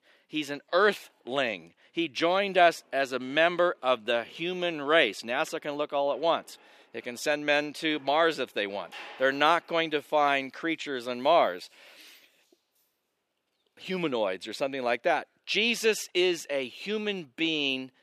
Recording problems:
thin; very slightly; fading below 350 Hz
household noises; faint; until 13 s; 25 dB below the speech

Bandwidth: 14.5 kHz